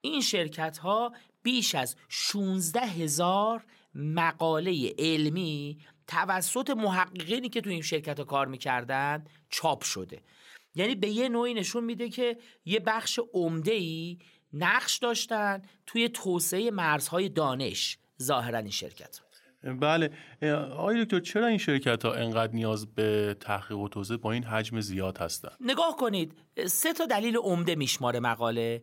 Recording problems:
none

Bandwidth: 16 kHz